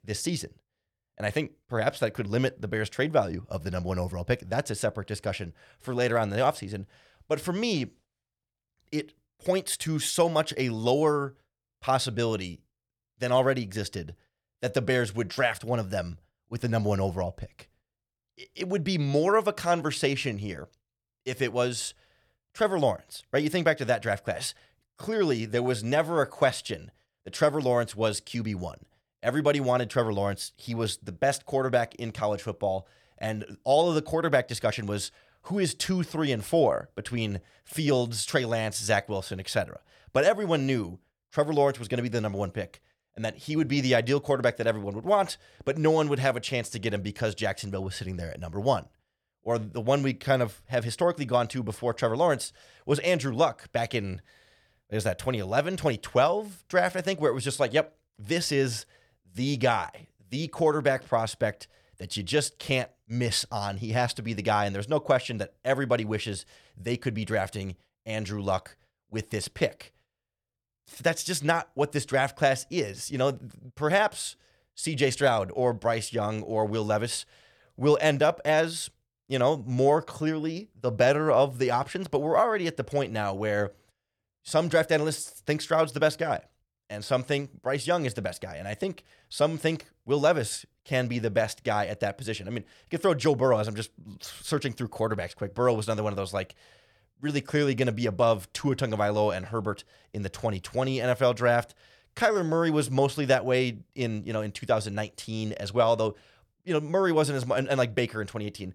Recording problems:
none

